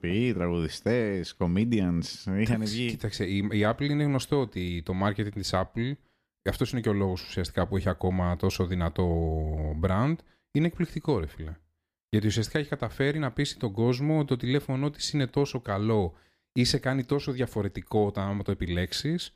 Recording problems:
none

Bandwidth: 15 kHz